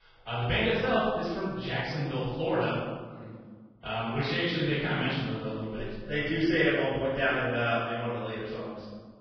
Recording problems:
room echo; strong; dies away in 1.4 s
off-mic speech; far
garbled, watery; badly; nothing above 5.5 kHz

